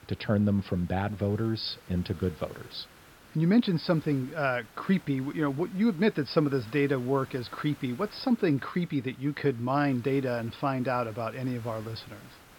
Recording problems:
high frequencies cut off; noticeable; nothing above 5.5 kHz
hiss; faint; throughout; 25 dB below the speech

